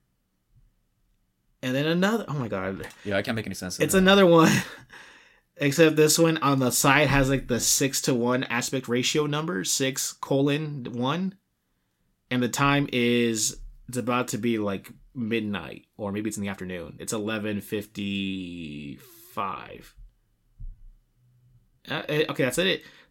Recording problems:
uneven, jittery; strongly; from 1.5 to 22 s

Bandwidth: 16.5 kHz